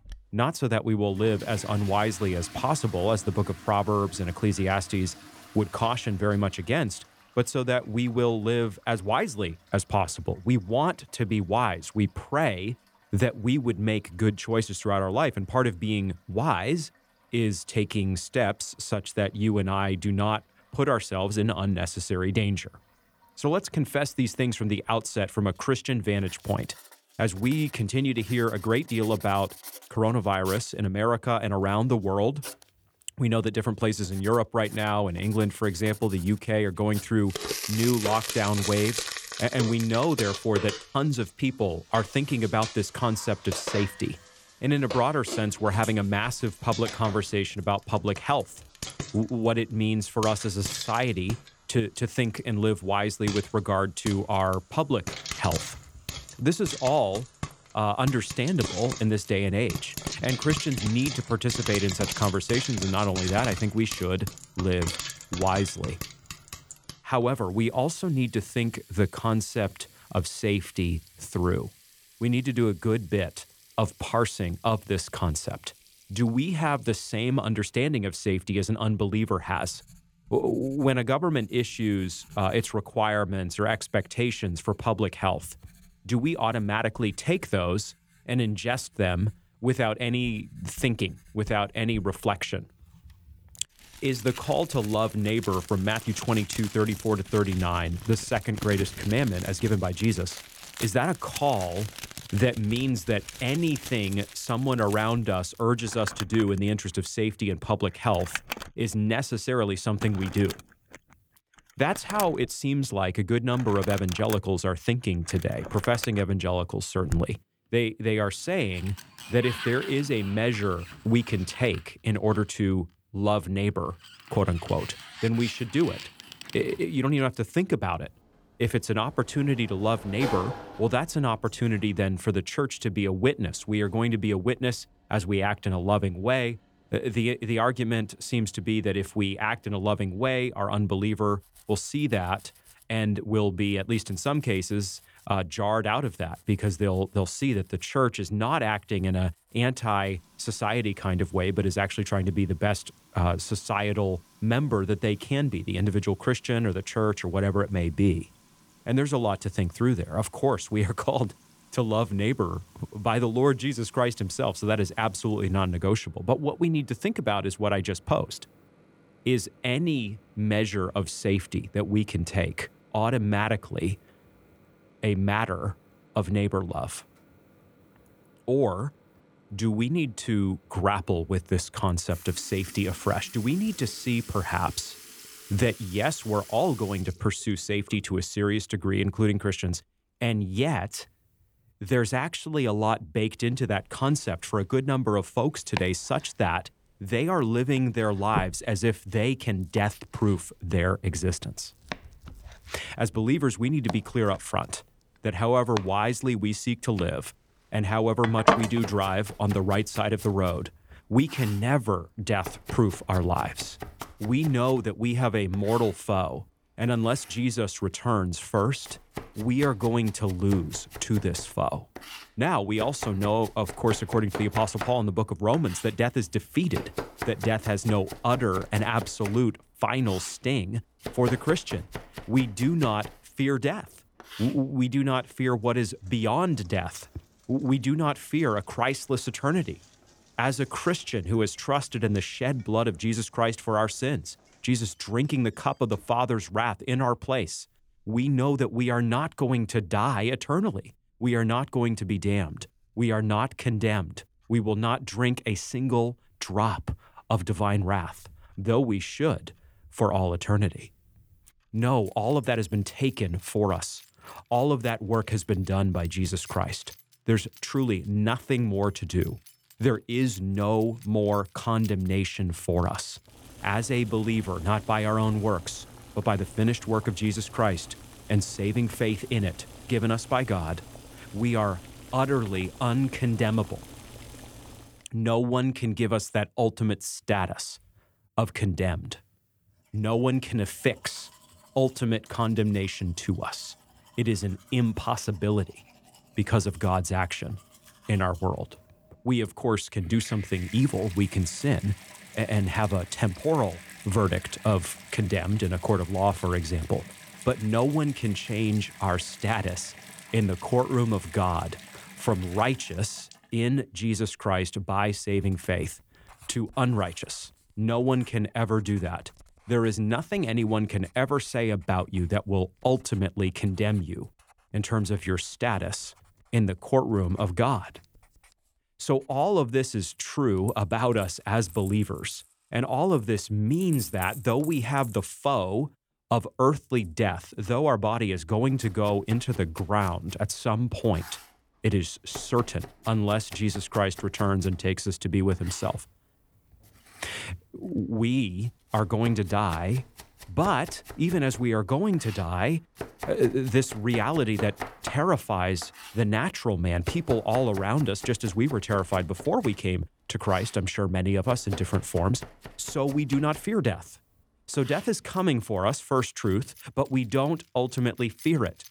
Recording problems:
household noises; noticeable; throughout; 10 dB below the speech

